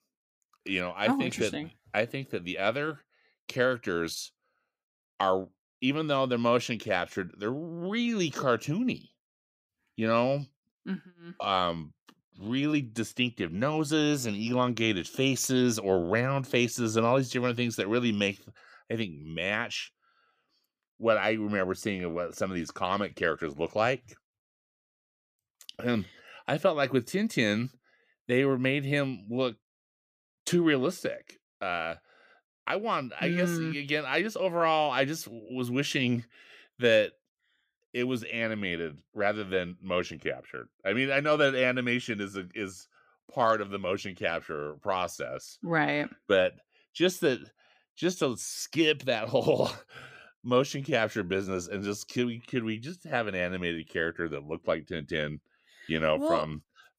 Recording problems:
none

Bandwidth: 15 kHz